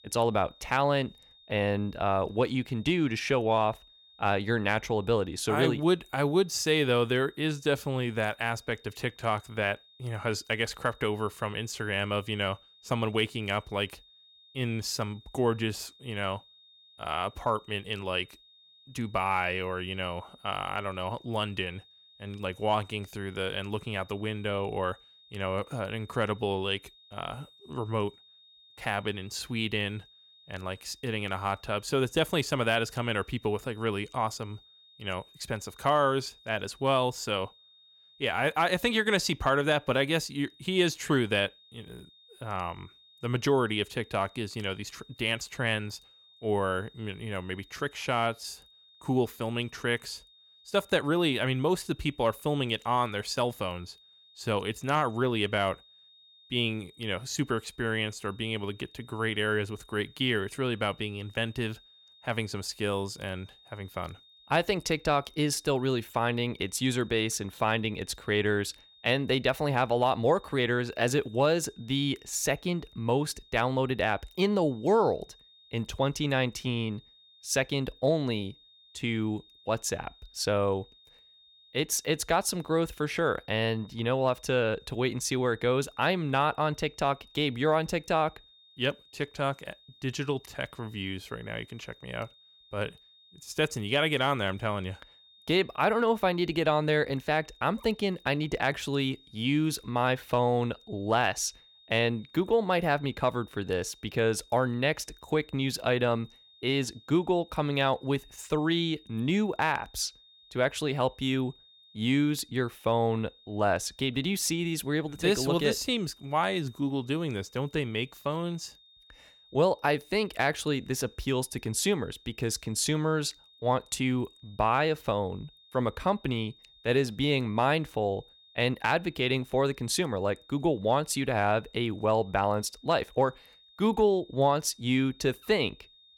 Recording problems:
high-pitched whine; faint; throughout; 3.5 kHz, 25 dB below the speech

